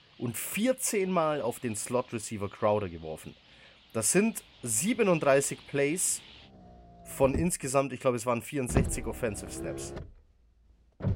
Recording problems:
traffic noise; noticeable; throughout; 10 dB below the speech

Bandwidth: 16 kHz